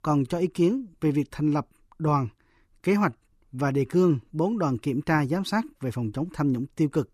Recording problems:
none

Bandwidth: 14.5 kHz